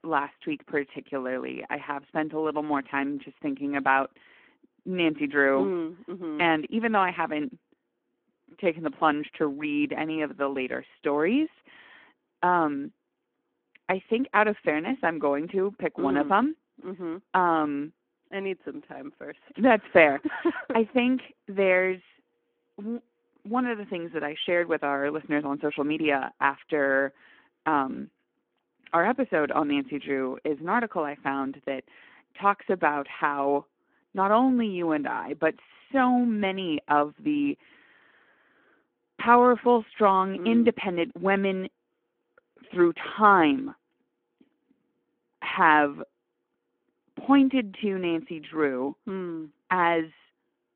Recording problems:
phone-call audio

